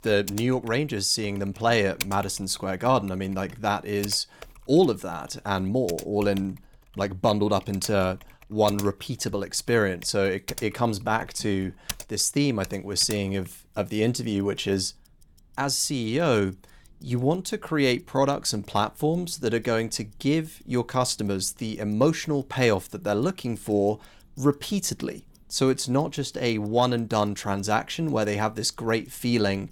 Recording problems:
household noises; noticeable; throughout; 15 dB below the speech

